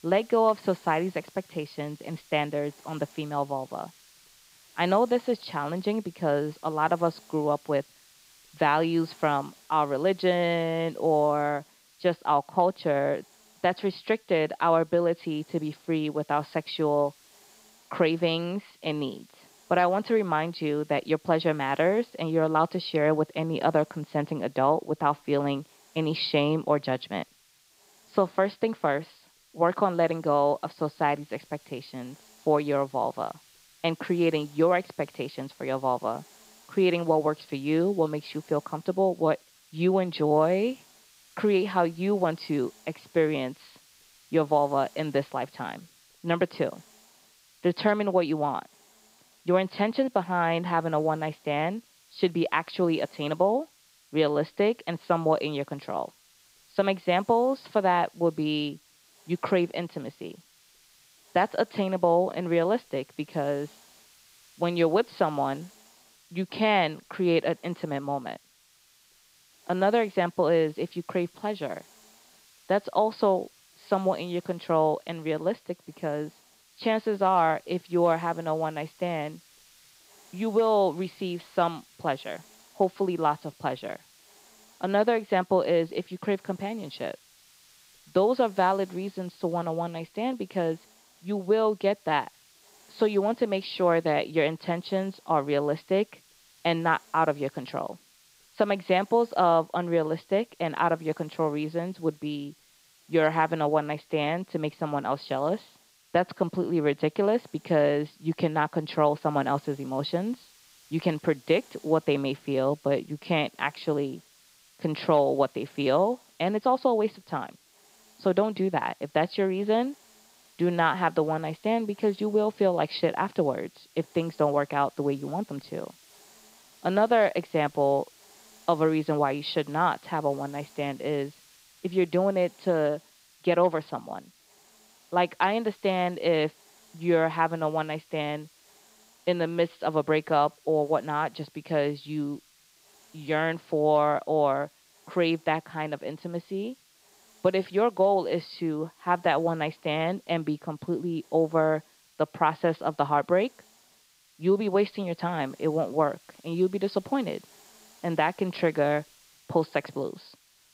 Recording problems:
high frequencies cut off; noticeable; nothing above 5 kHz
hiss; faint; throughout; 30 dB below the speech

